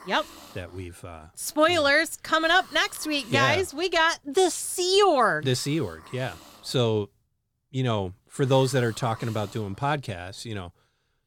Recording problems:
hiss; faint; throughout; 25 dB below the speech

